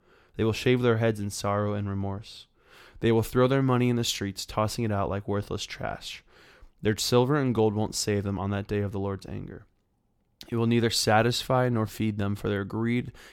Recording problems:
none

